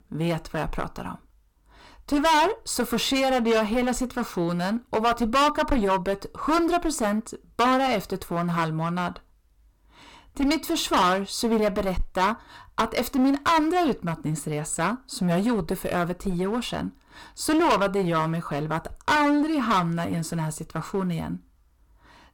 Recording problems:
distortion; heavy; 12% of the sound clipped

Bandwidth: 17.5 kHz